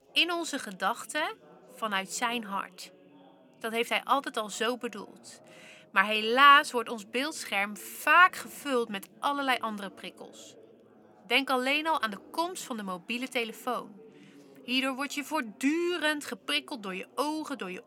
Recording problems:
background chatter; faint; throughout; 3 voices, 25 dB below the speech

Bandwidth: 17 kHz